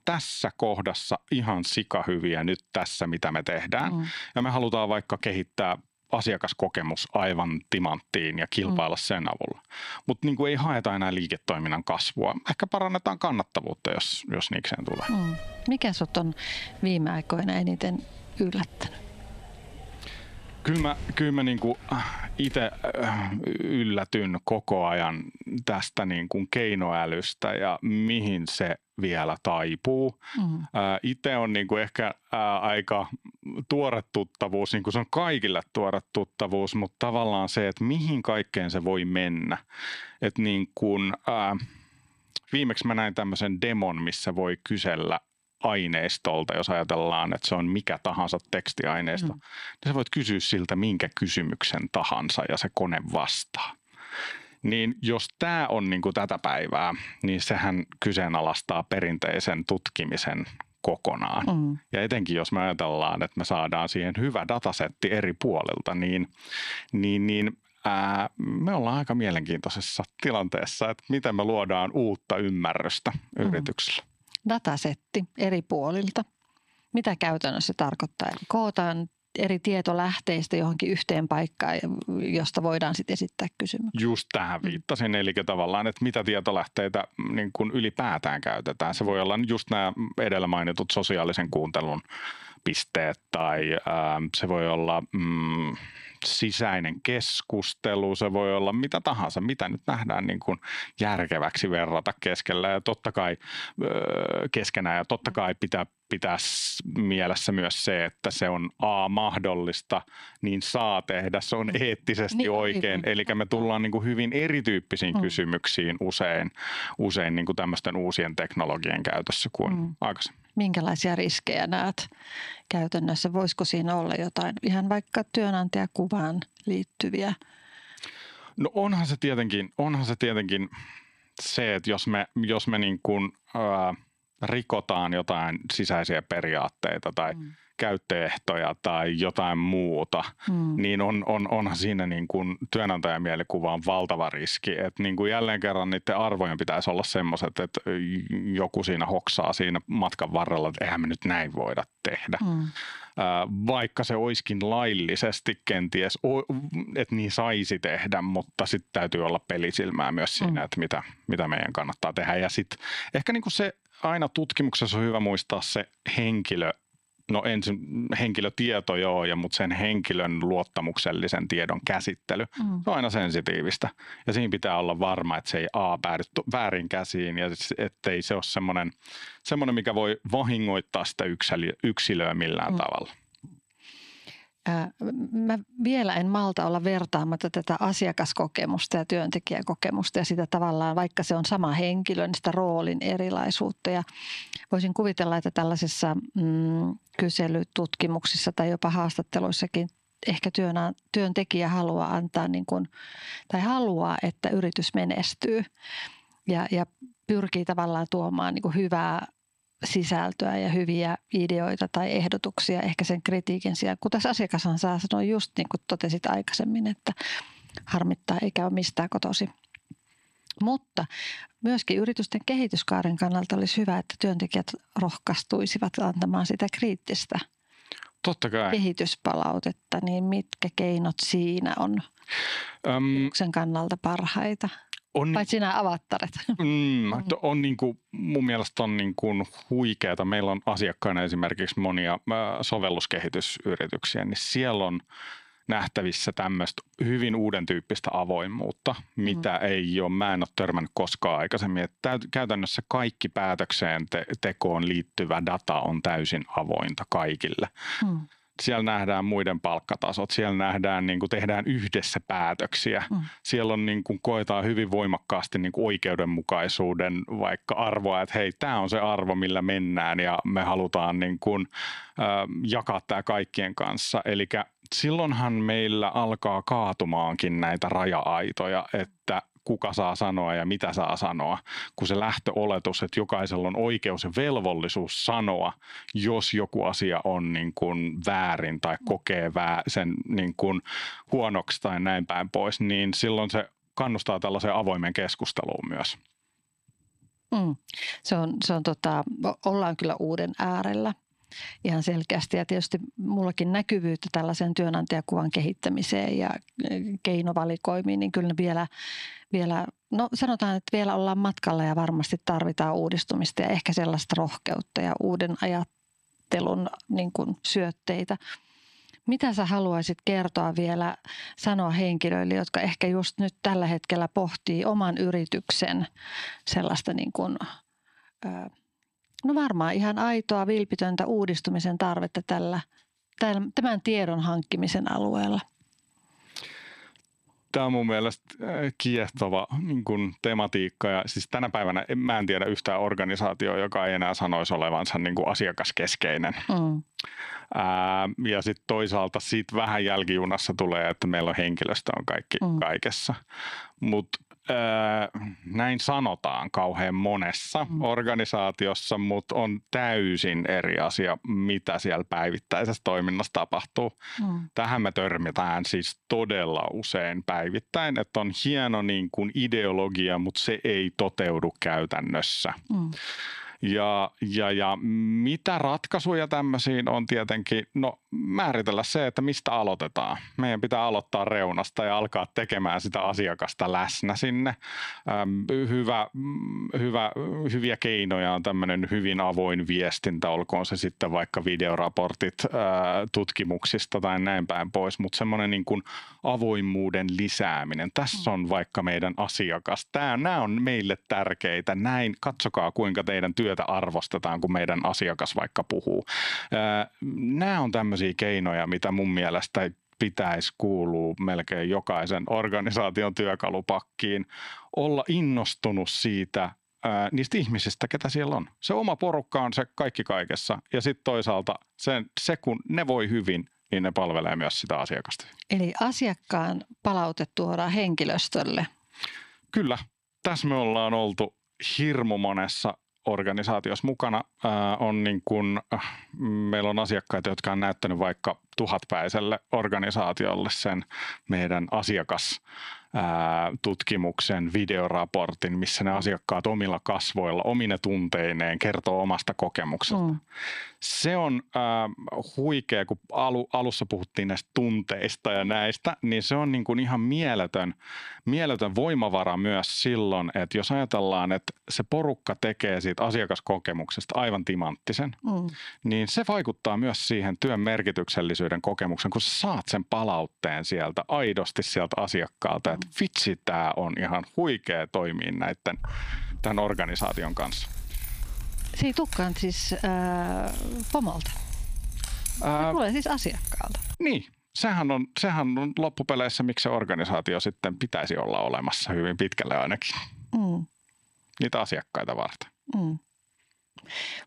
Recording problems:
squashed, flat; heavily
door banging; noticeable; from 15 to 23 s; peak 9 dB below the speech
jangling keys; noticeable; from 7:56 to 8:04; peak 4 dB below the speech

